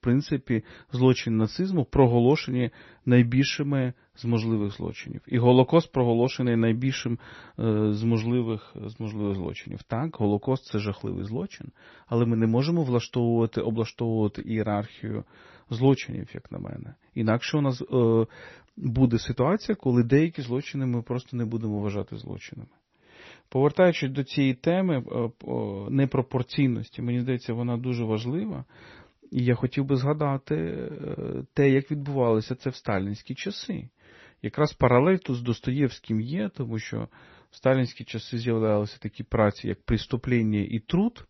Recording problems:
garbled, watery; slightly; nothing above 6 kHz

